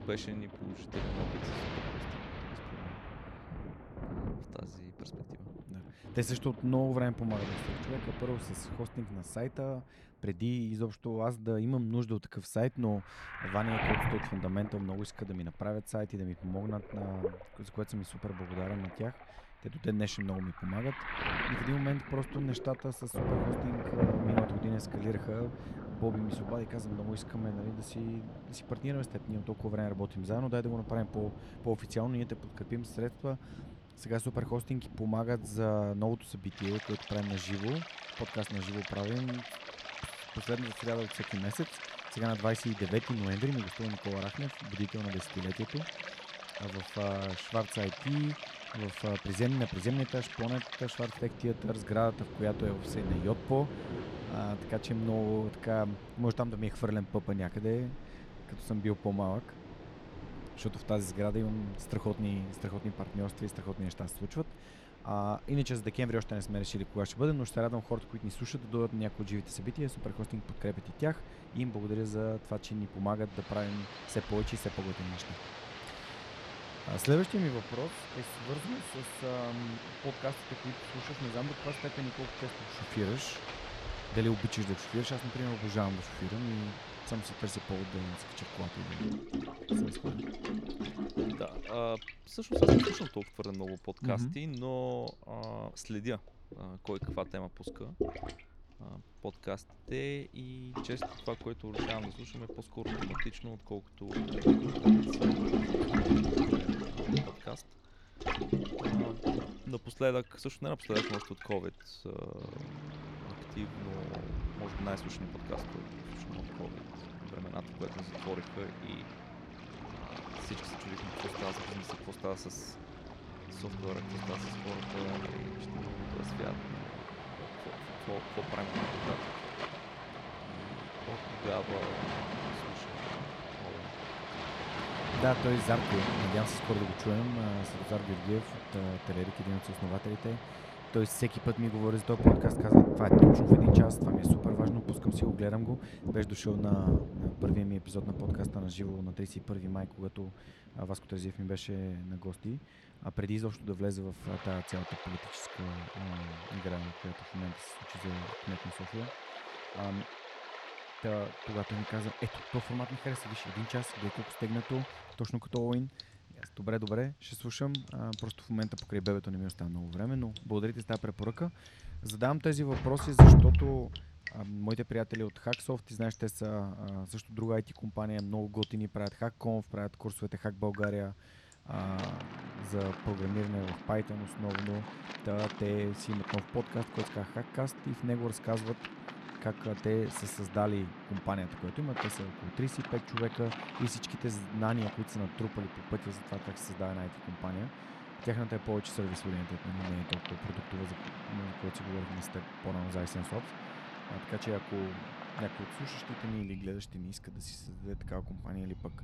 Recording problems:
rain or running water; very loud; throughout; 2 dB above the speech

